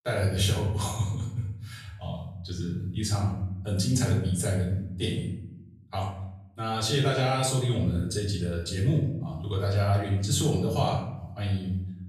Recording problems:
off-mic speech; far
room echo; noticeable; dies away in 0.9 s

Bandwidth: 15 kHz